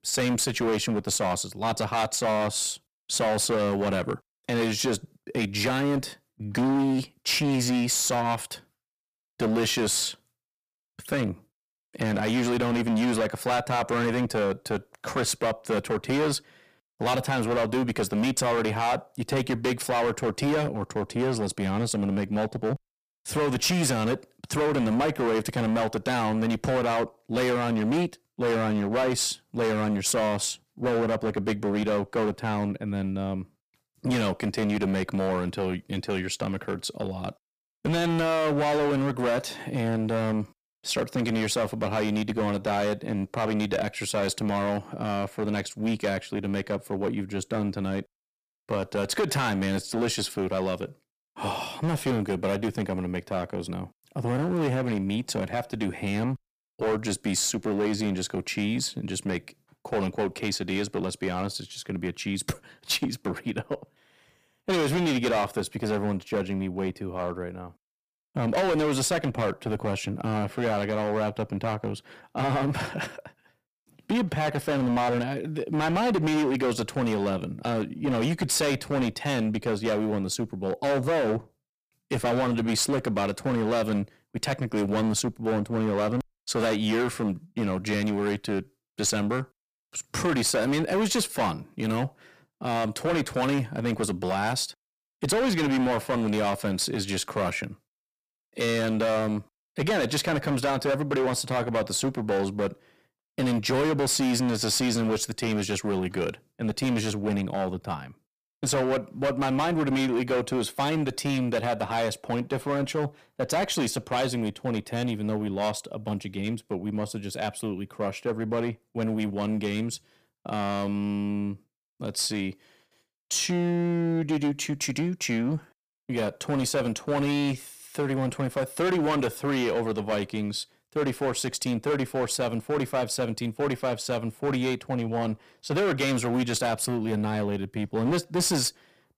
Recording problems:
distortion; heavy; 15% of the sound clipped

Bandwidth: 15 kHz